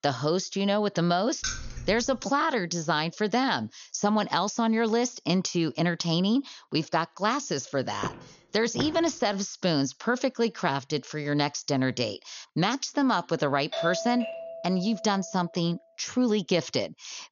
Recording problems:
high frequencies cut off; noticeable; nothing above 6.5 kHz
jangling keys; noticeable; at 1.5 s; peak 6 dB below the speech
footsteps; noticeable; at 8 s; peak 9 dB below the speech
doorbell; noticeable; from 14 to 15 s; peak 4 dB below the speech

